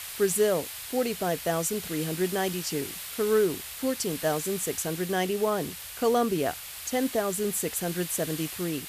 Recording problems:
hiss; loud; throughout; 8 dB below the speech

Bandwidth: 14.5 kHz